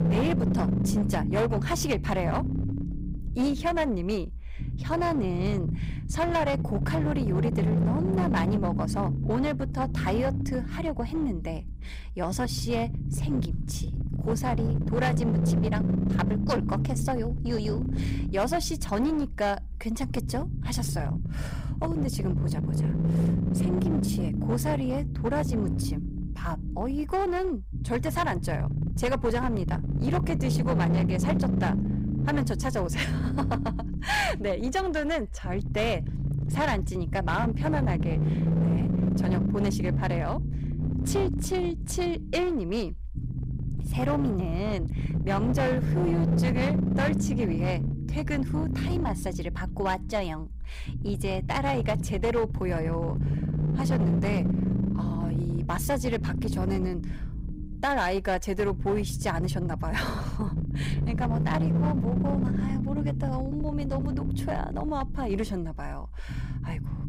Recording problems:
distortion; slight; 13% of the sound clipped
low rumble; loud; throughout; 7 dB below the speech

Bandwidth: 15.5 kHz